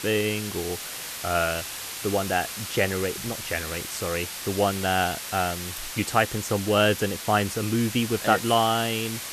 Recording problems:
hiss; loud; throughout; 7 dB below the speech

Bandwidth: 14 kHz